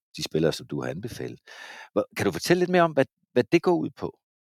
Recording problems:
none

